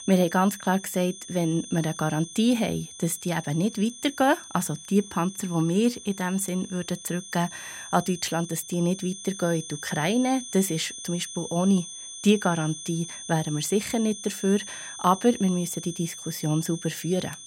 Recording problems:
high-pitched whine; noticeable; throughout; 6 kHz, 10 dB below the speech

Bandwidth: 16 kHz